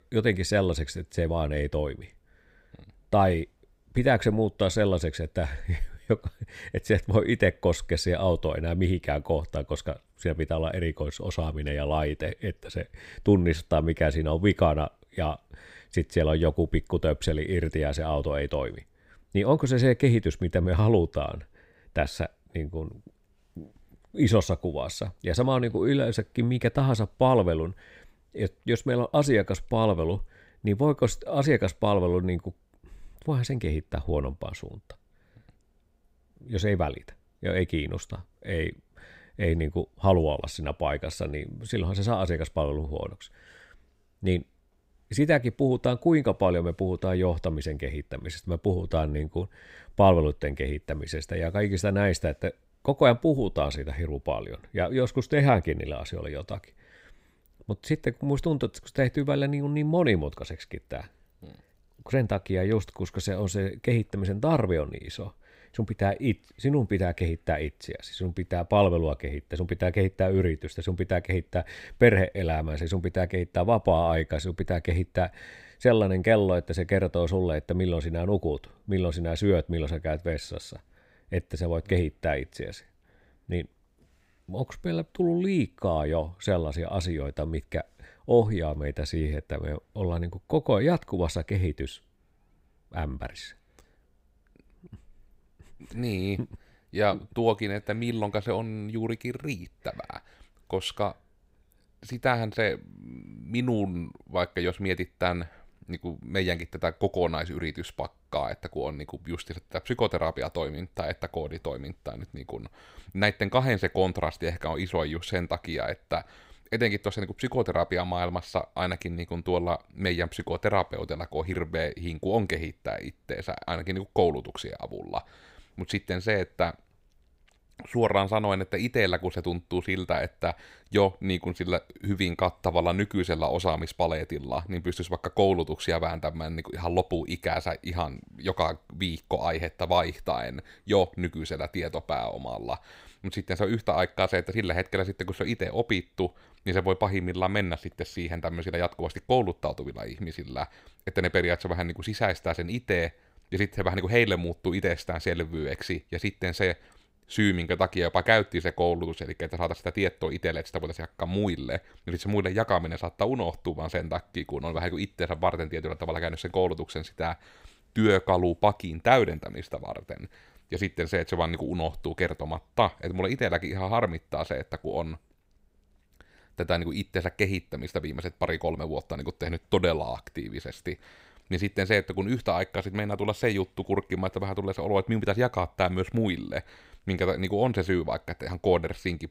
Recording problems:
none

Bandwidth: 15.5 kHz